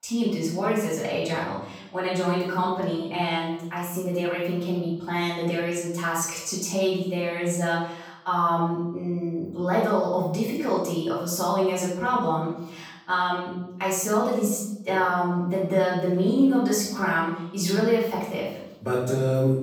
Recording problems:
off-mic speech; far
room echo; noticeable; dies away in 0.7 s

